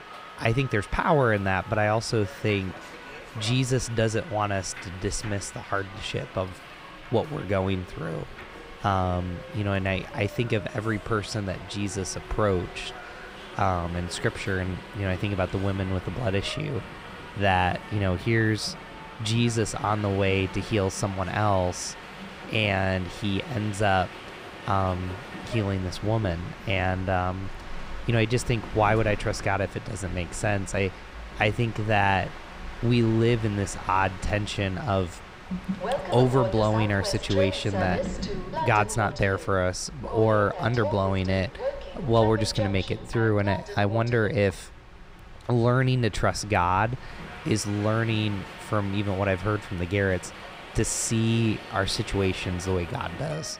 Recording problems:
train or aircraft noise; noticeable; throughout; 10 dB below the speech

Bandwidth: 15.5 kHz